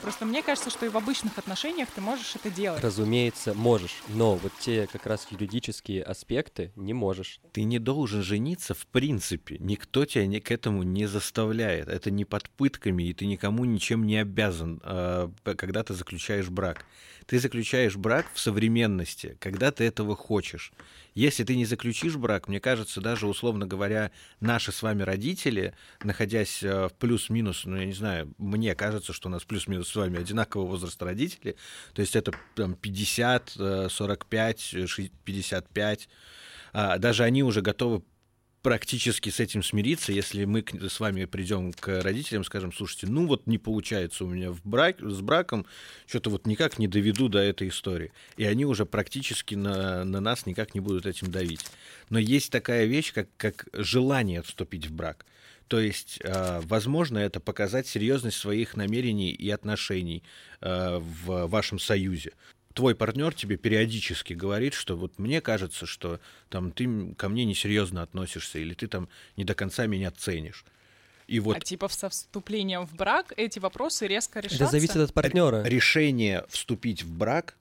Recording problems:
household noises; noticeable; throughout; 20 dB below the speech

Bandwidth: 16 kHz